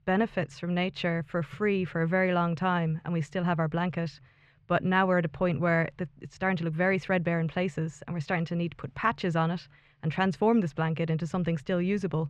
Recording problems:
muffled; slightly; fading above 2.5 kHz

